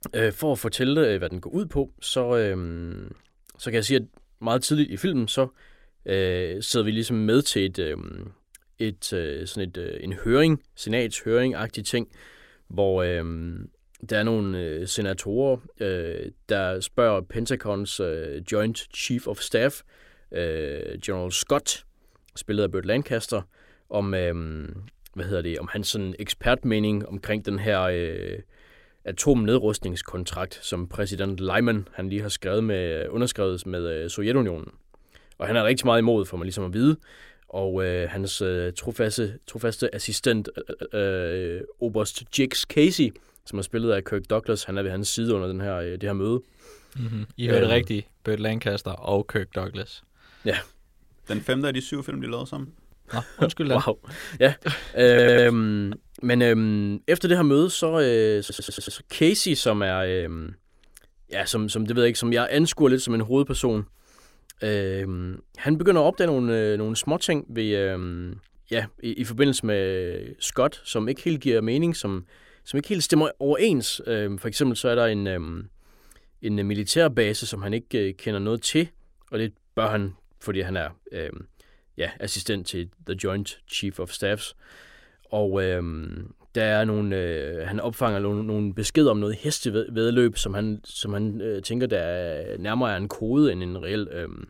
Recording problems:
audio stuttering; at 40 s, at 55 s and at 58 s

